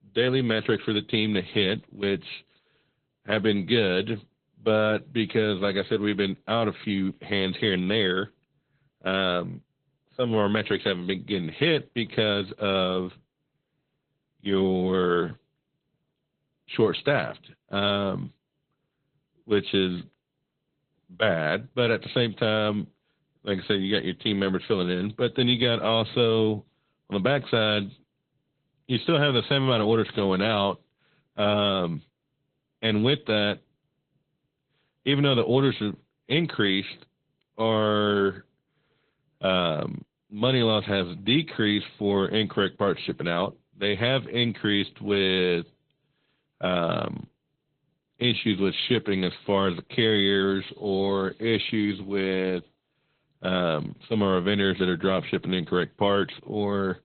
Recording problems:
high frequencies cut off; severe; nothing above 3.5 kHz
garbled, watery; slightly

